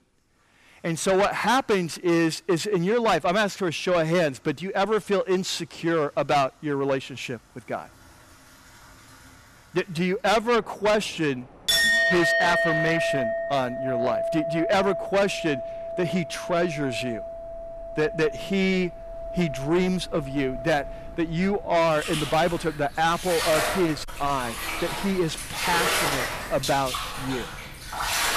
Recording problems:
distortion; heavy; 8 dB below the speech
household noises; loud; throughout; 2 dB below the speech
train or aircraft noise; faint; from 10 s on; 25 dB below the speech

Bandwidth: 14 kHz